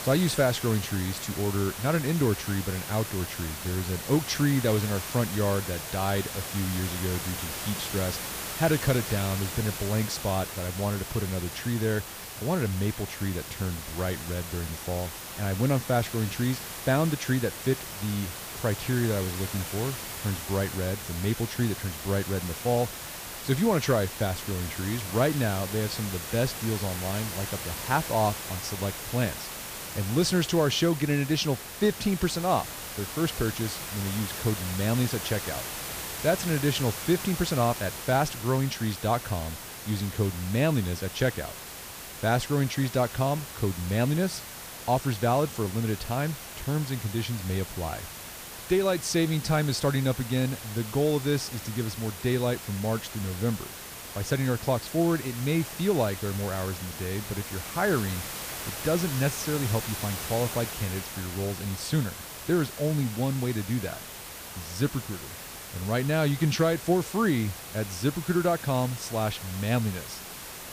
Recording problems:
hiss; loud; throughout; 7 dB below the speech

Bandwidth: 15 kHz